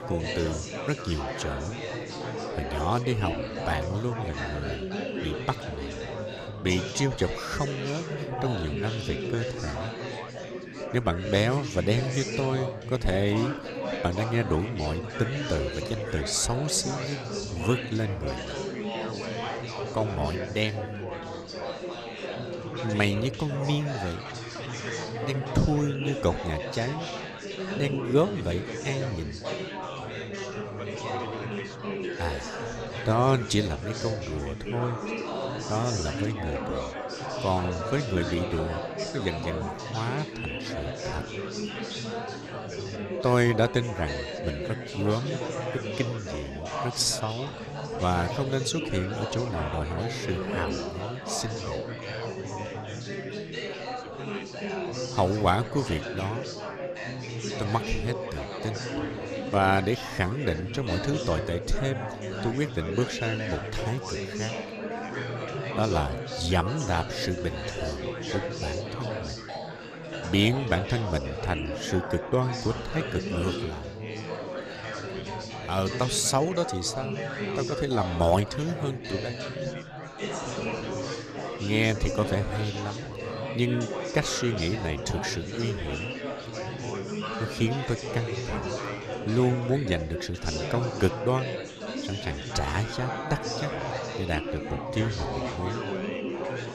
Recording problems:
chatter from many people; loud; throughout; 4 dB below the speech

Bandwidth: 14.5 kHz